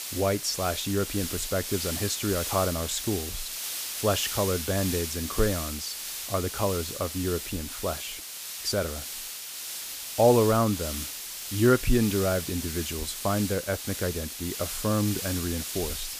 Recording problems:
hiss; loud; throughout; 5 dB below the speech

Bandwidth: 15 kHz